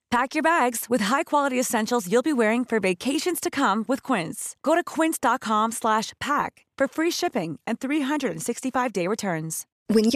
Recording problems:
abrupt cut into speech; at the end

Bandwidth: 14 kHz